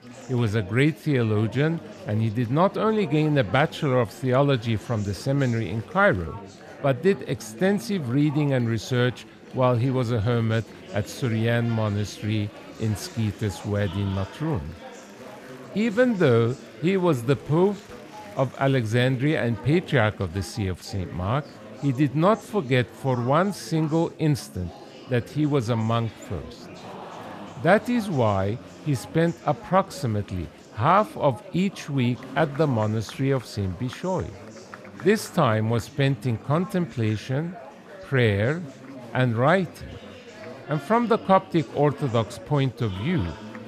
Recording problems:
chatter from many people; noticeable; throughout; 15 dB below the speech

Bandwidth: 14.5 kHz